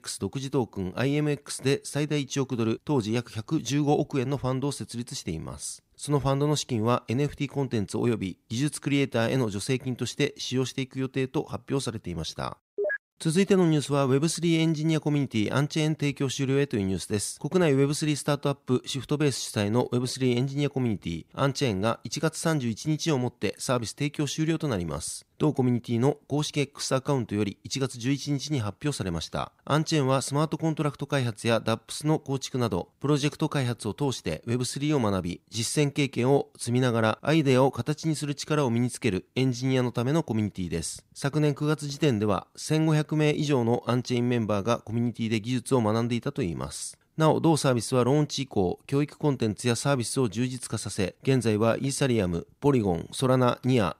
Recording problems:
none

